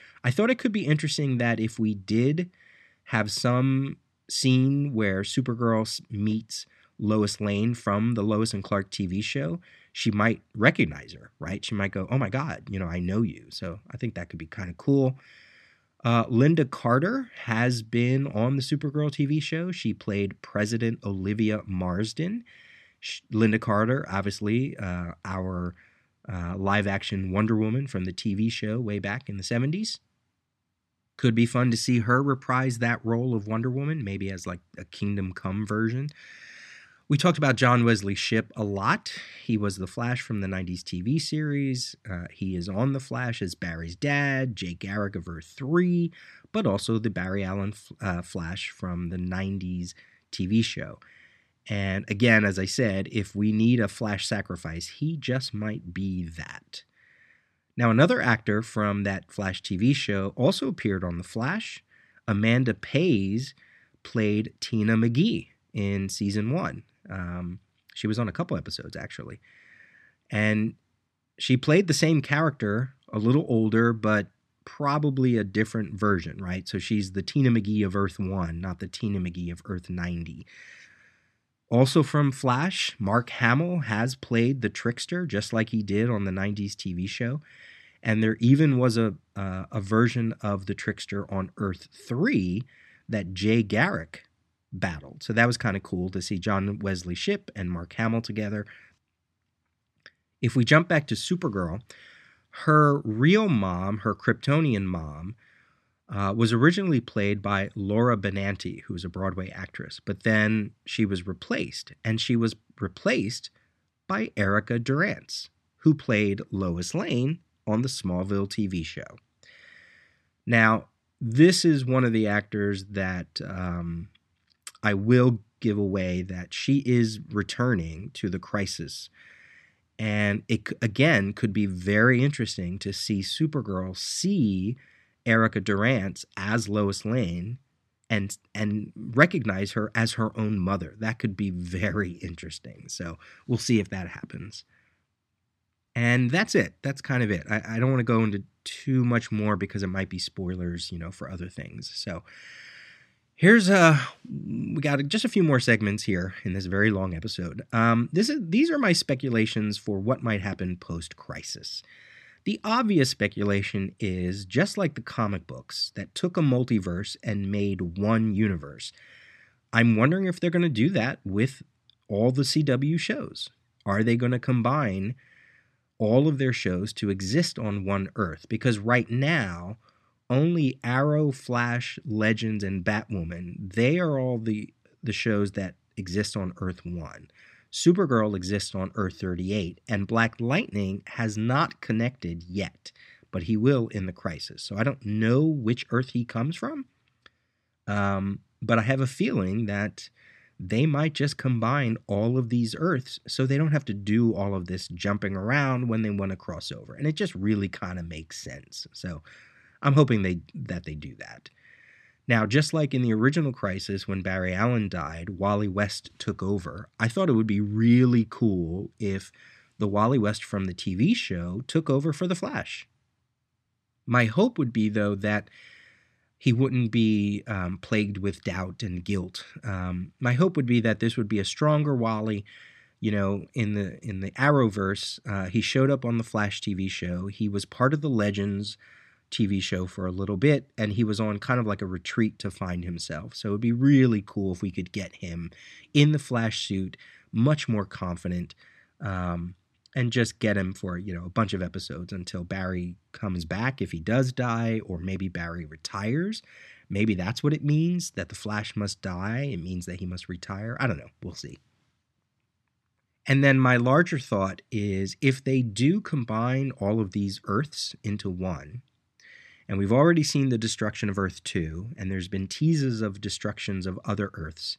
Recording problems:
none

